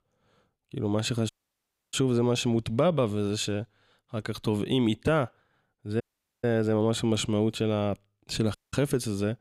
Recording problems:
audio cutting out; at 1.5 s for 0.5 s, at 6 s and at 8.5 s

